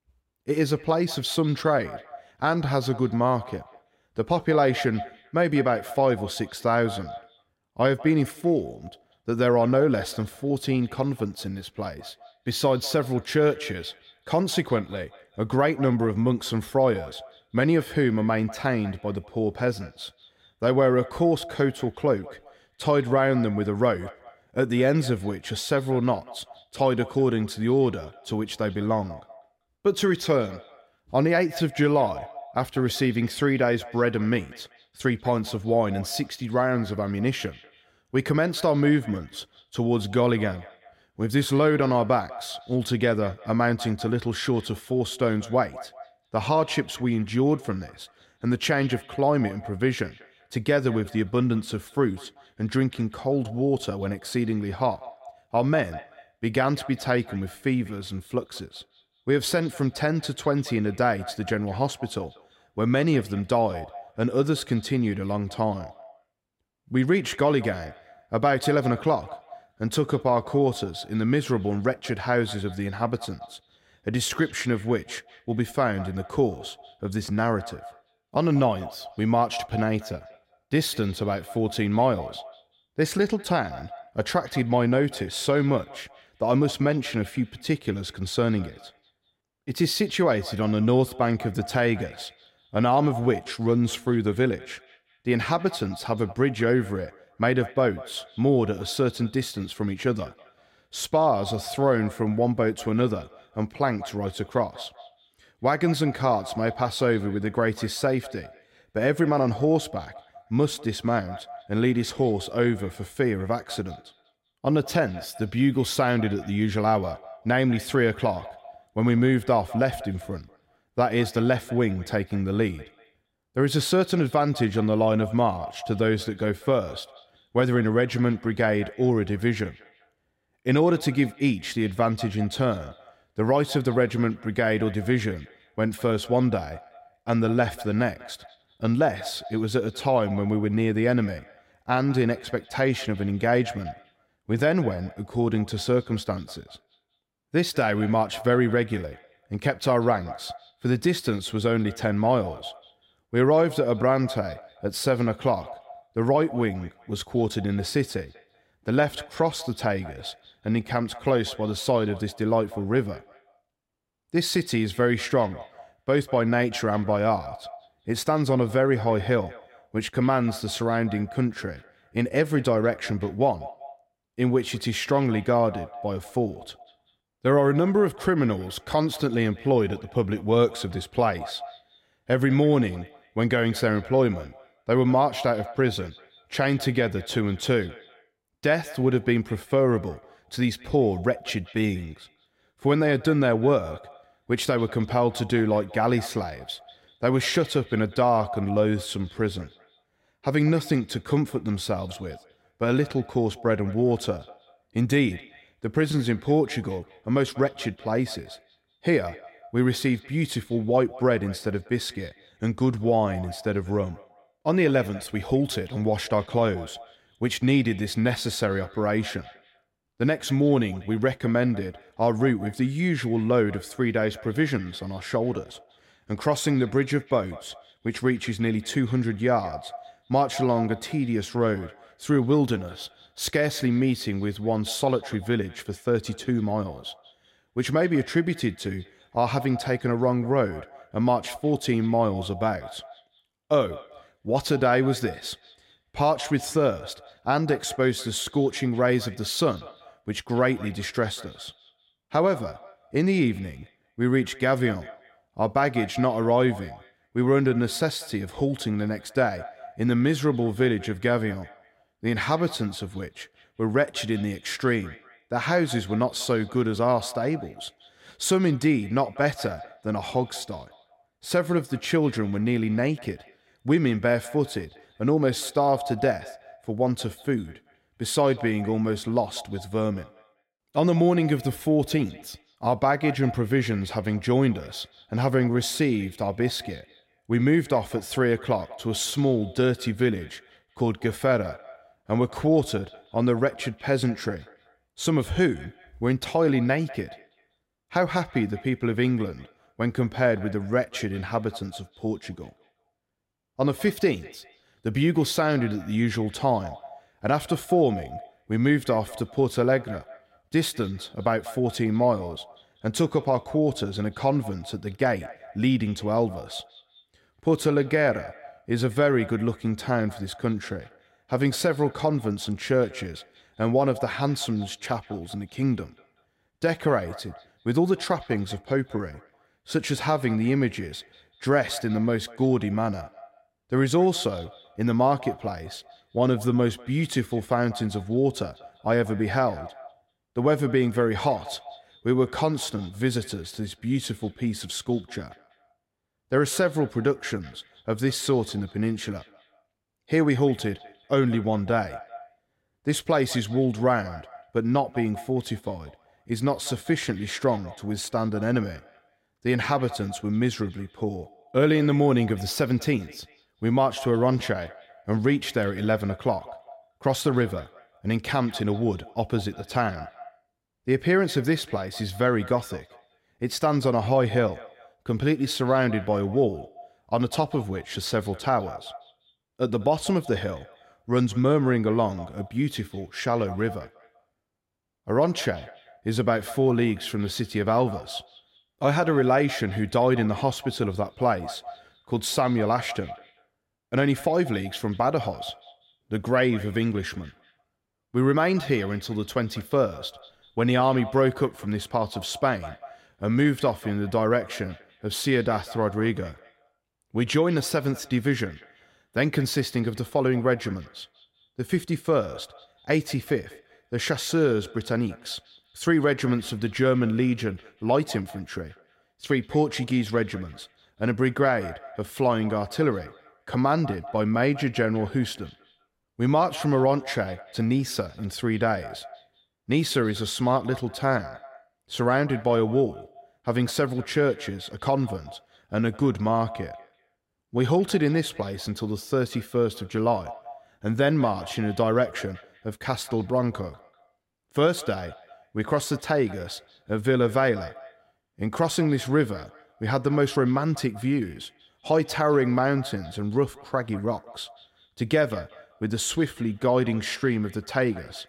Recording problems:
echo of what is said; faint; throughout; 190 ms later, 20 dB below the speech

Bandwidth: 16 kHz